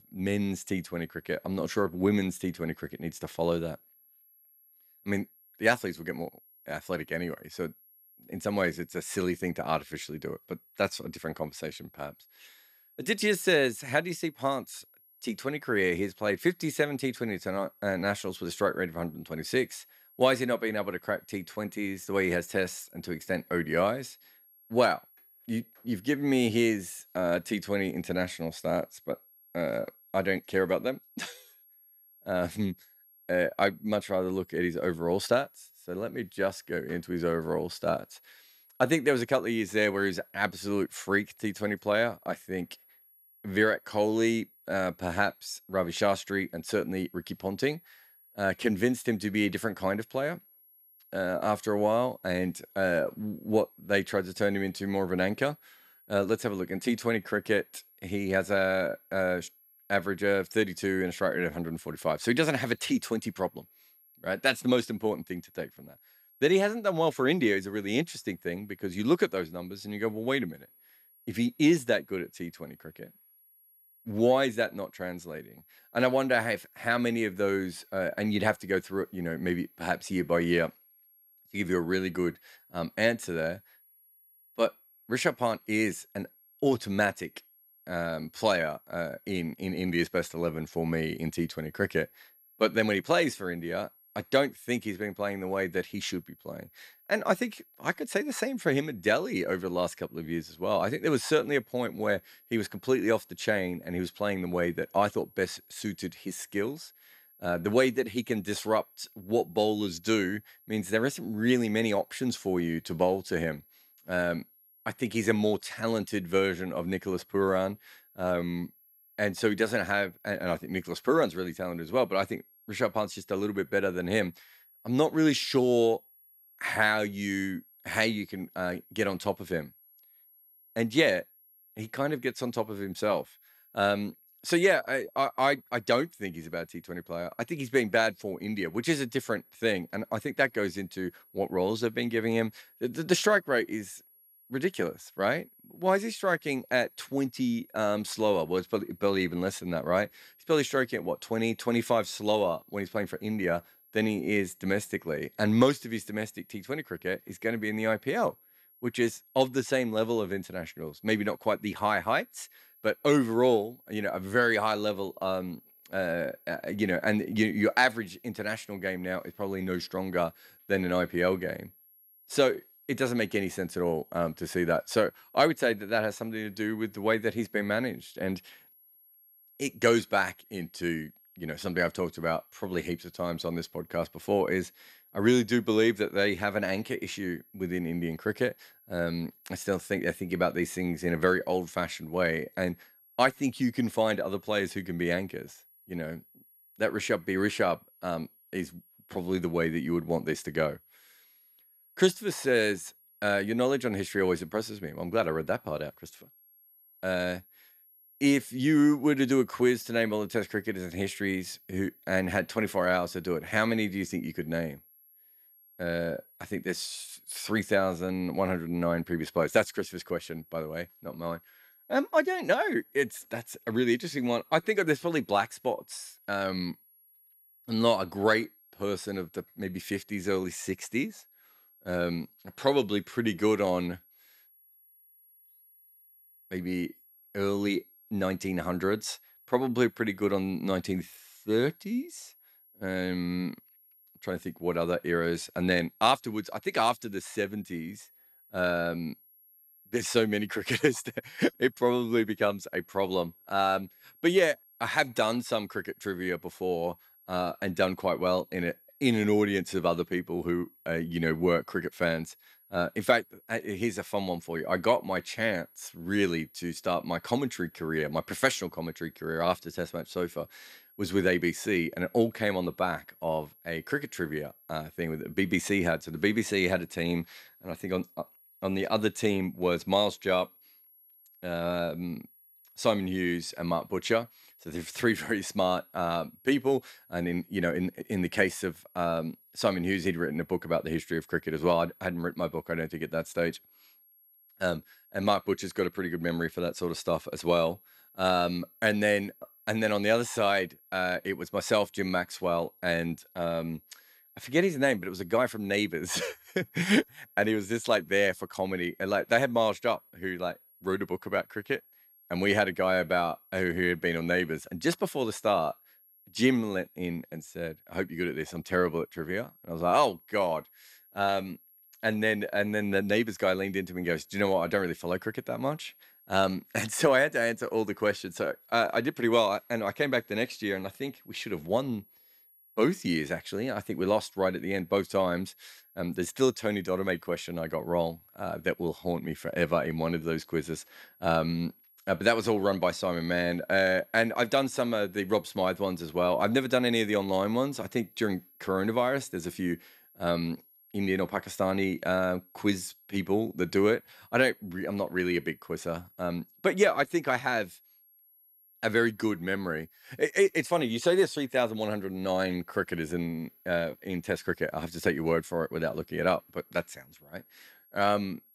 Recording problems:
high-pitched whine; faint; throughout; 11.5 kHz, 30 dB below the speech

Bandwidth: 14.5 kHz